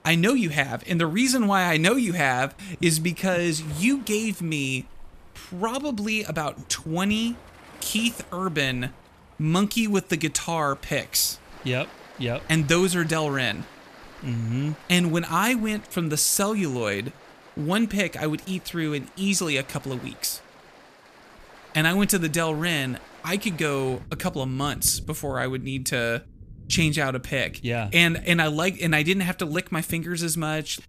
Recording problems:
rain or running water; faint; throughout; 20 dB below the speech

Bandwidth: 14.5 kHz